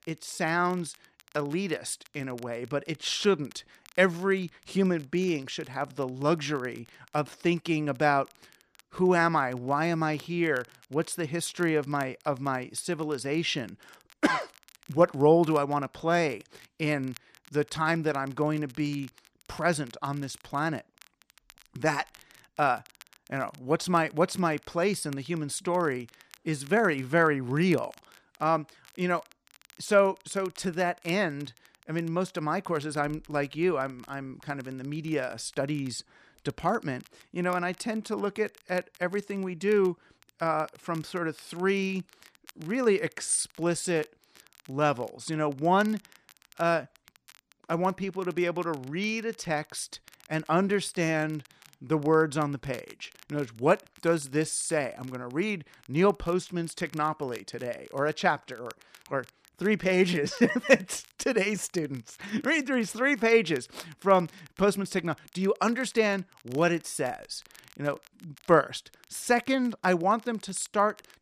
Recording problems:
crackle, like an old record; faint; 25 dB below the speech

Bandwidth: 14.5 kHz